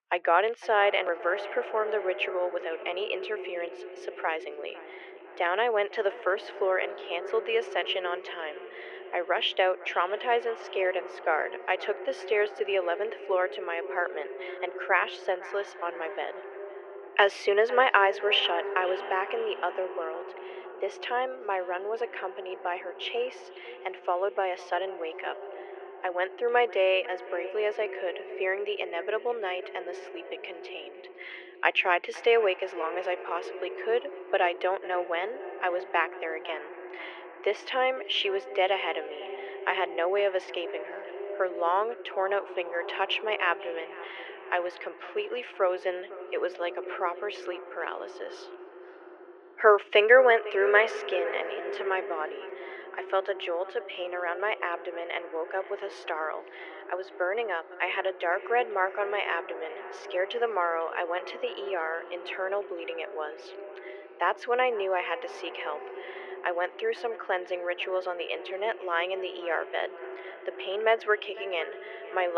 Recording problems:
muffled; very; fading above 2.5 kHz
thin; very; fading below 400 Hz
echo of what is said; noticeable; throughout; 500 ms later, 10 dB below the speech
abrupt cut into speech; at the end

